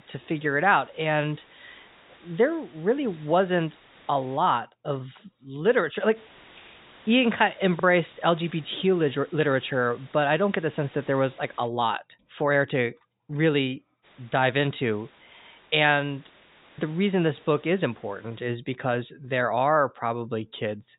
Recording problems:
high frequencies cut off; severe; nothing above 4 kHz
hiss; faint; until 4.5 s, from 6 to 12 s and from 14 to 18 s; 25 dB below the speech

